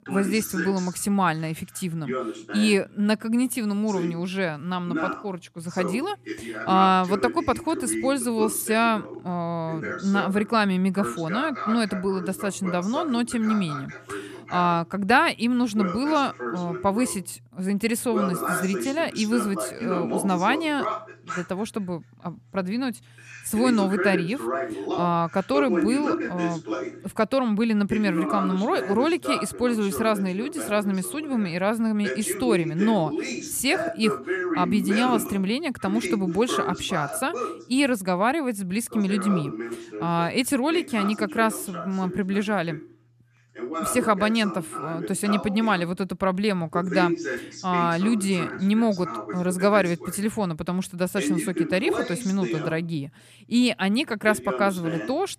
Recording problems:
voice in the background; loud; throughout; 7 dB below the speech

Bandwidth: 14.5 kHz